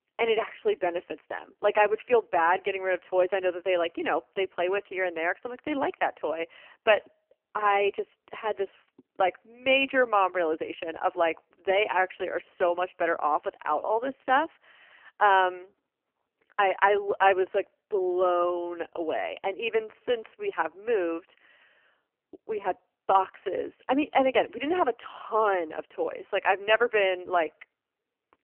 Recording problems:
phone-call audio; poor line; nothing above 3 kHz

